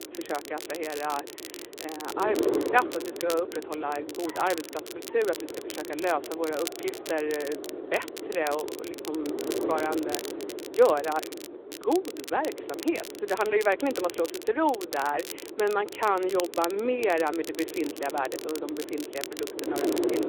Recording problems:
phone-call audio
wind noise on the microphone; heavy; 10 dB below the speech
crackle, like an old record; noticeable; 10 dB below the speech
traffic noise; faint; throughout; 25 dB below the speech

